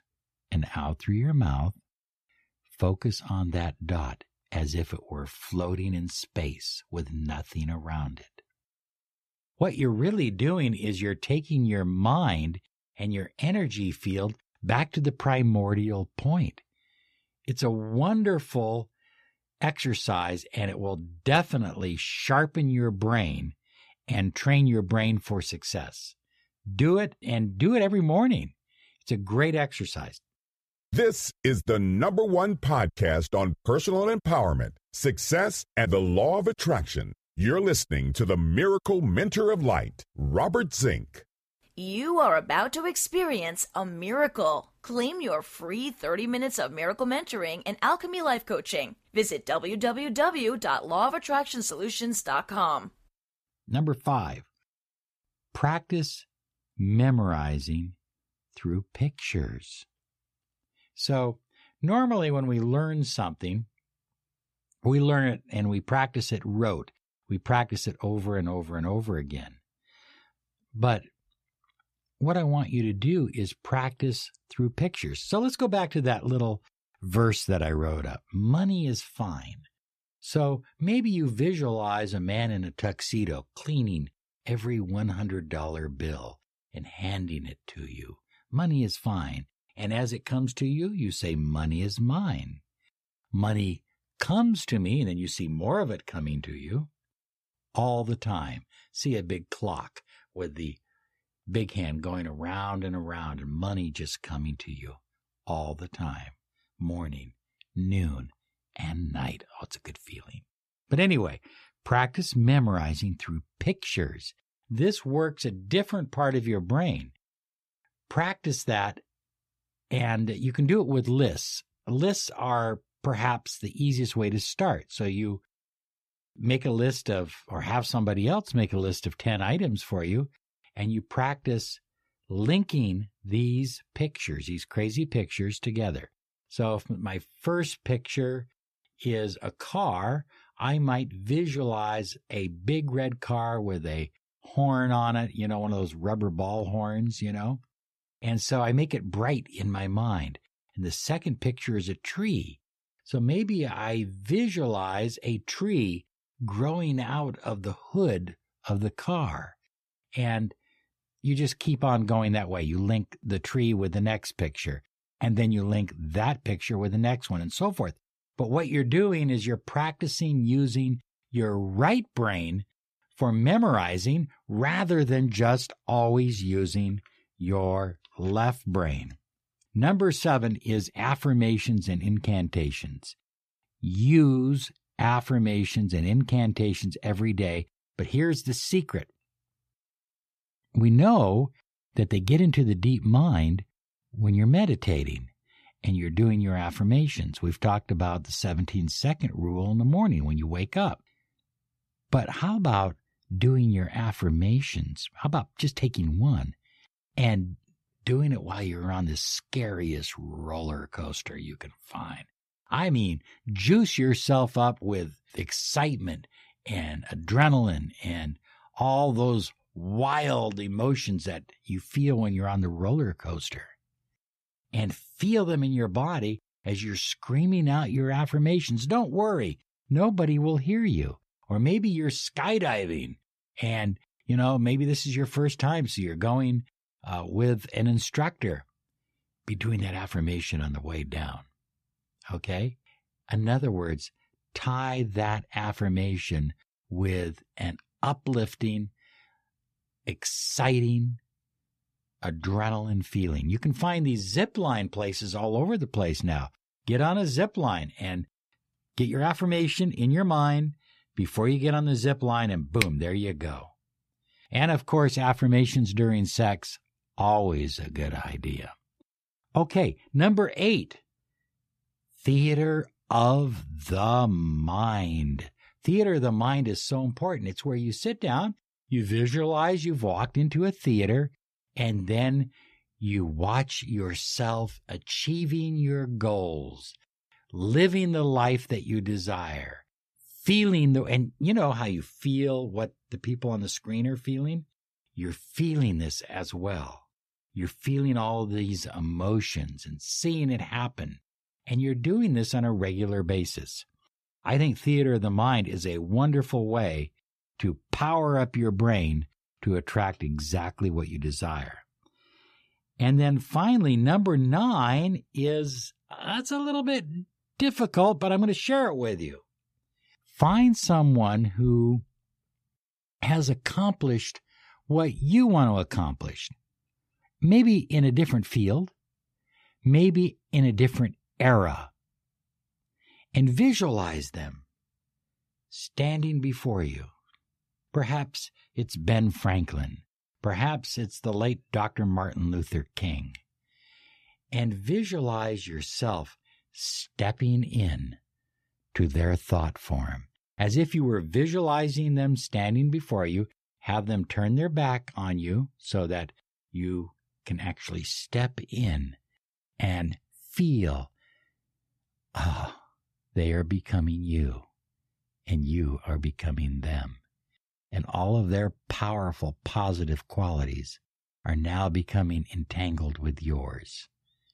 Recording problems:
none

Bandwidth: 14.5 kHz